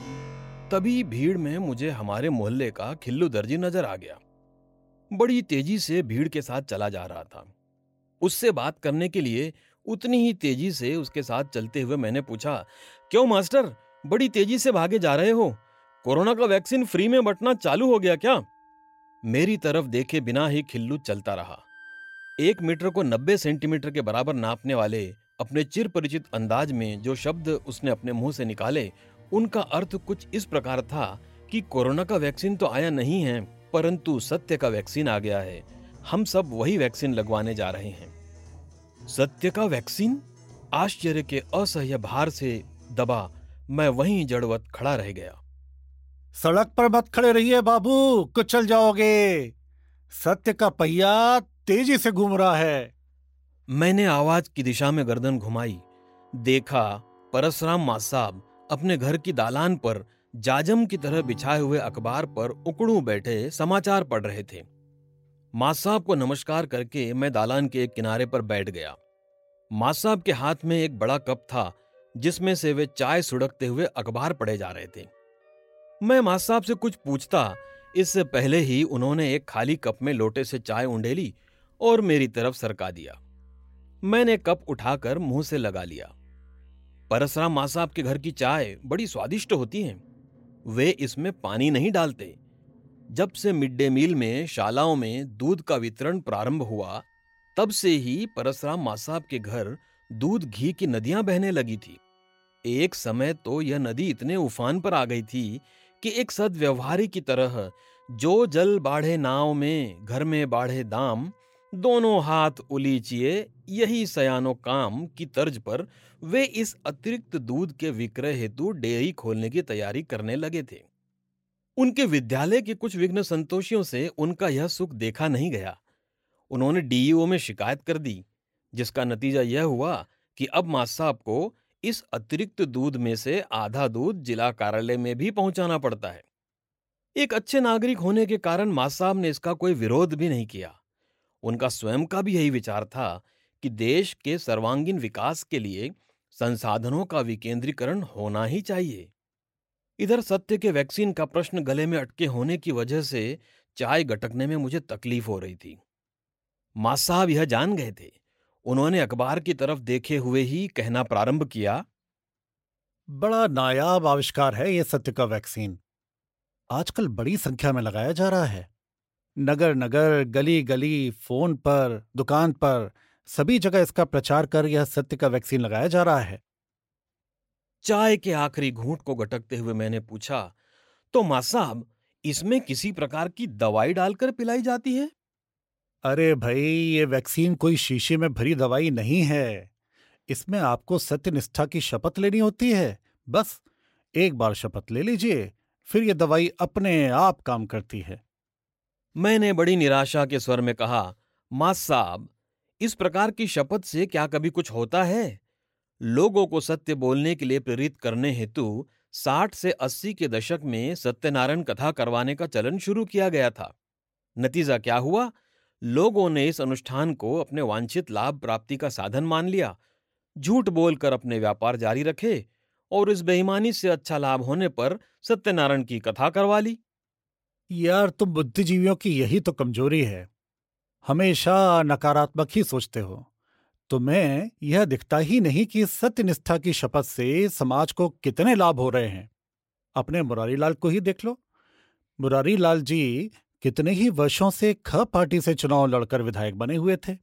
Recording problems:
background music; faint; until 2:03; 30 dB below the speech

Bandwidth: 16 kHz